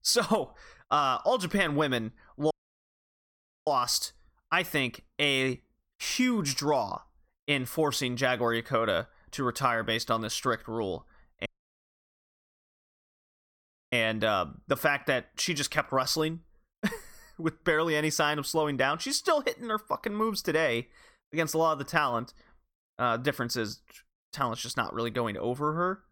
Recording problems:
audio cutting out; at 2.5 s for 1 s and at 11 s for 2.5 s

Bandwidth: 17.5 kHz